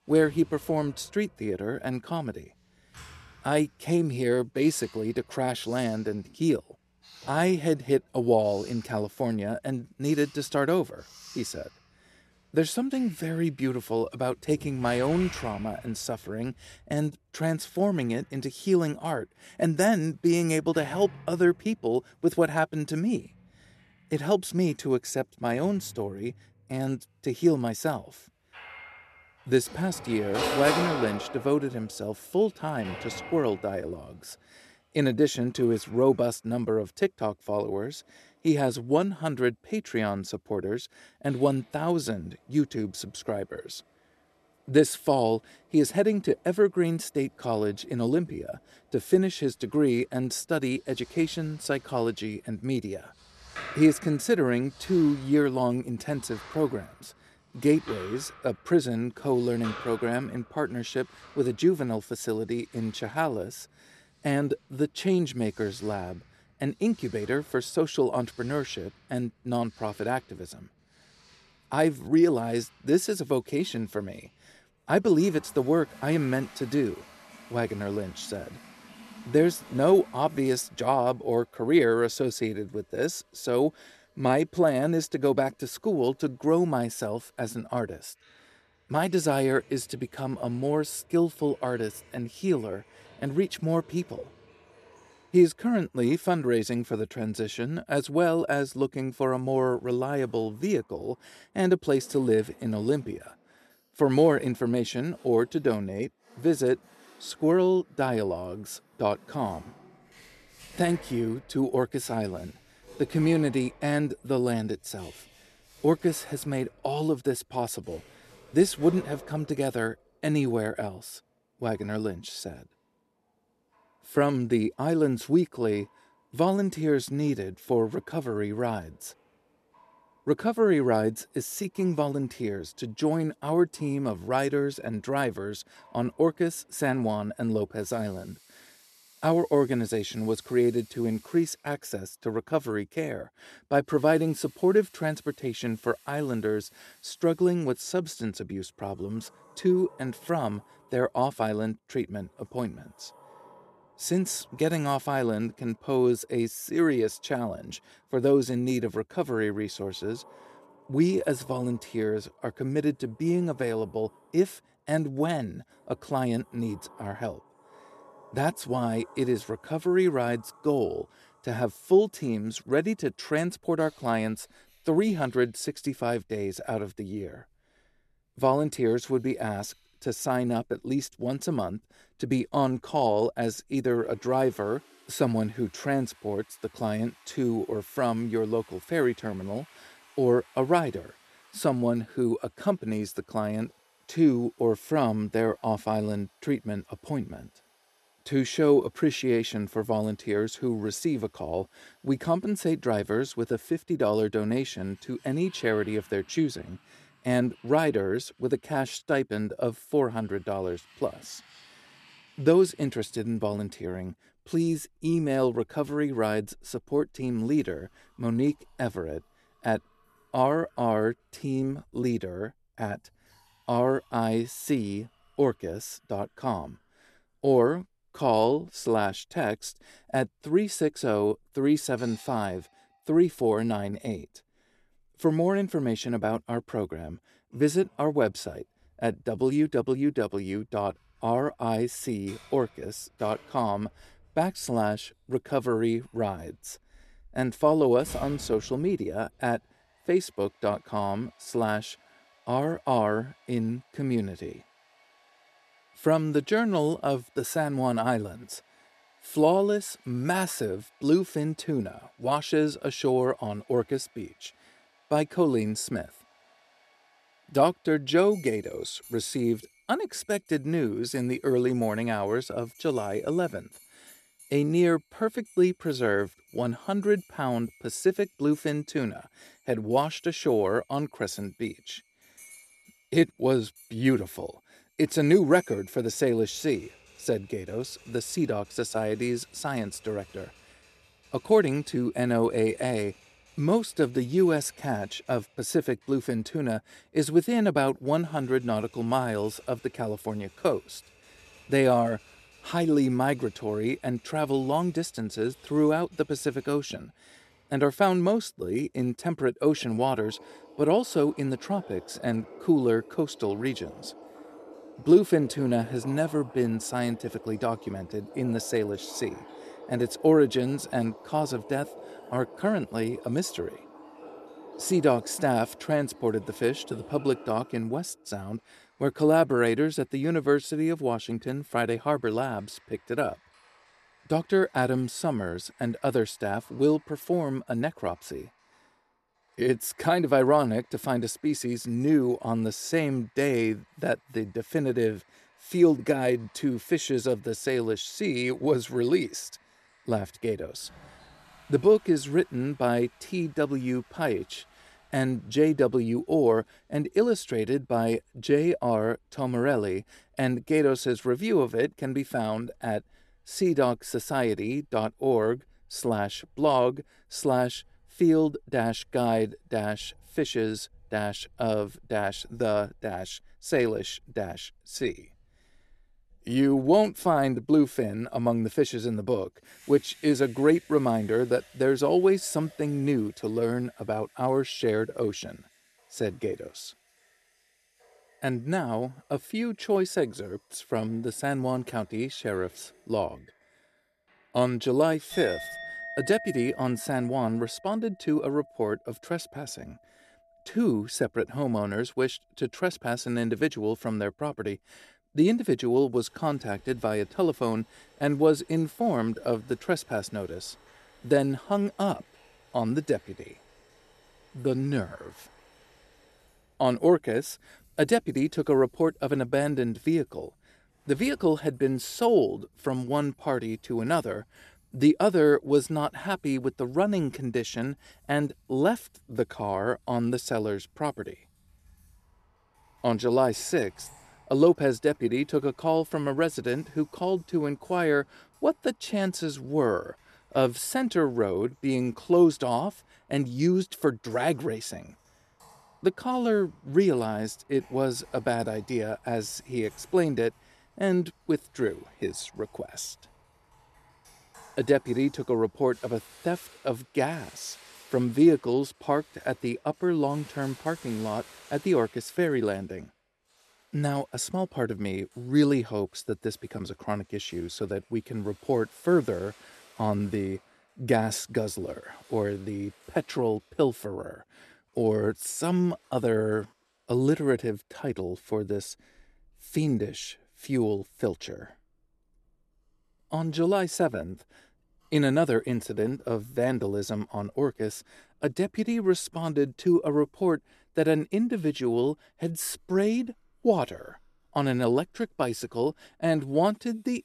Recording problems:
household noises; faint; throughout; 20 dB below the speech

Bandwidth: 13.5 kHz